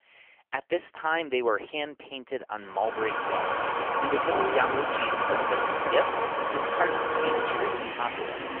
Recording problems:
phone-call audio; poor line; nothing above 3 kHz
traffic noise; very loud; from 3 s on; 3 dB above the speech

